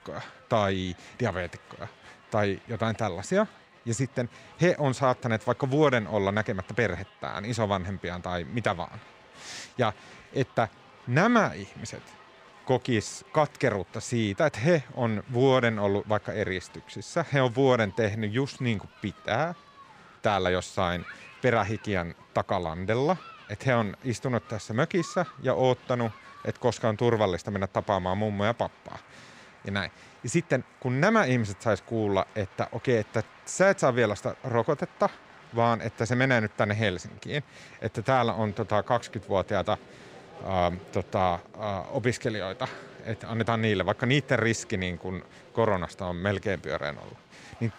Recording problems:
crowd noise; faint; throughout; 25 dB below the speech

